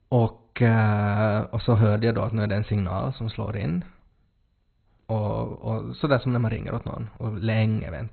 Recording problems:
garbled, watery; badly; nothing above 4 kHz

